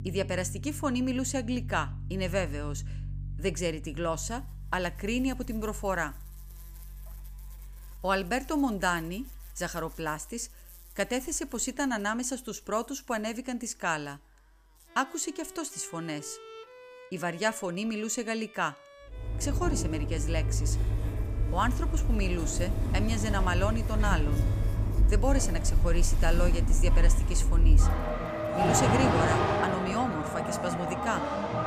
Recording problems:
traffic noise; very loud; from 19 s on; 3 dB above the speech
background music; noticeable; throughout; 10 dB below the speech
electrical hum; faint; from 4 to 17 s and from 21 to 29 s; 50 Hz, 25 dB below the speech

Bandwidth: 15 kHz